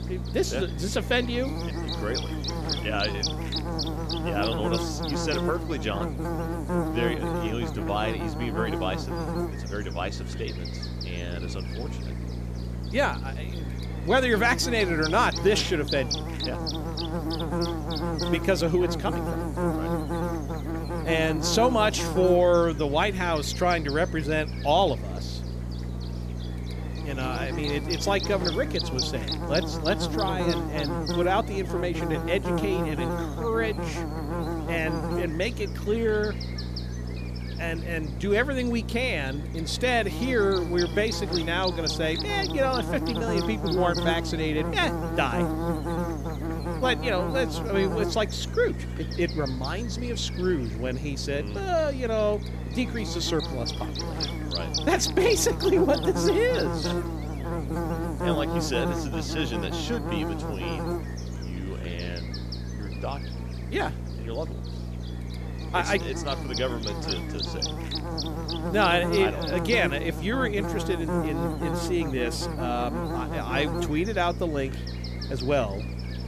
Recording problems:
electrical hum; loud; throughout; 60 Hz, 7 dB below the speech

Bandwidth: 14.5 kHz